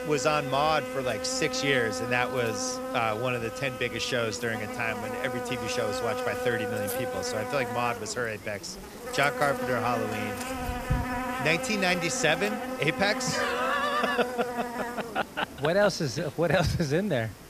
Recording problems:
electrical hum; loud; throughout; 50 Hz, 5 dB below the speech

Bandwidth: 14.5 kHz